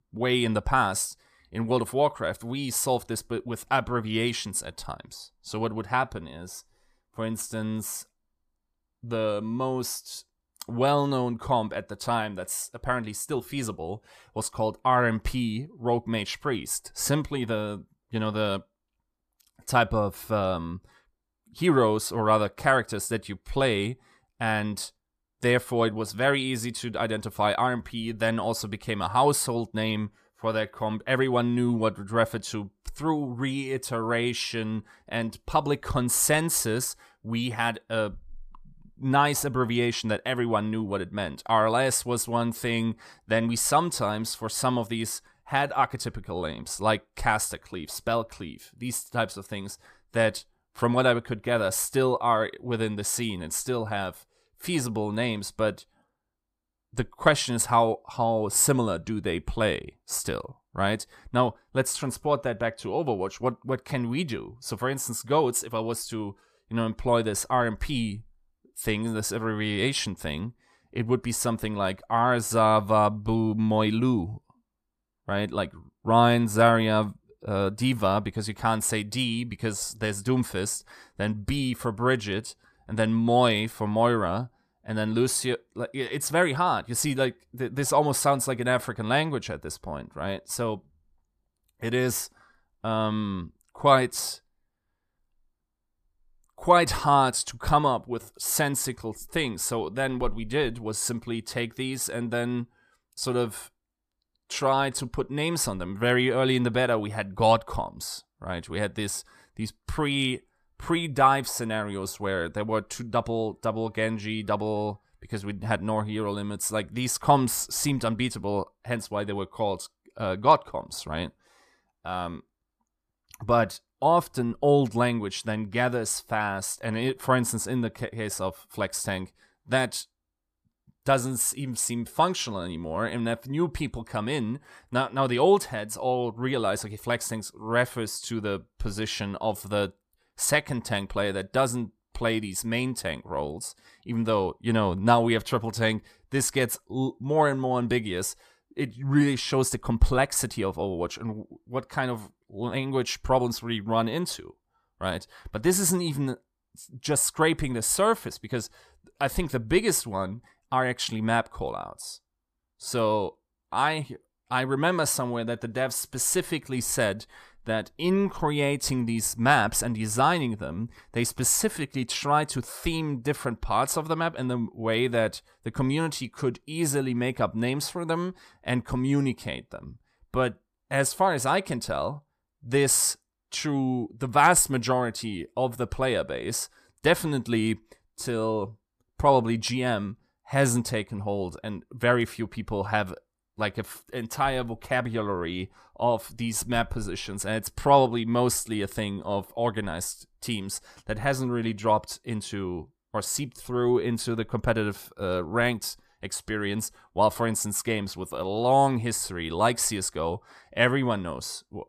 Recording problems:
none

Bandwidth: 14.5 kHz